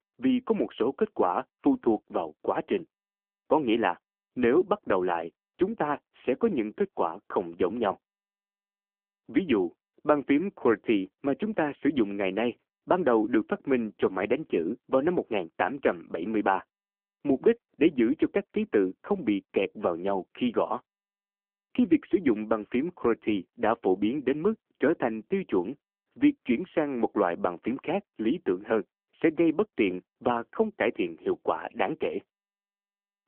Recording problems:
phone-call audio; poor line; nothing above 3 kHz

